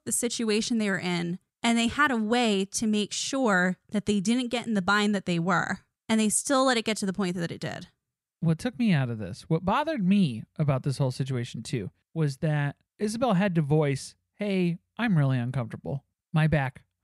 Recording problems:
none

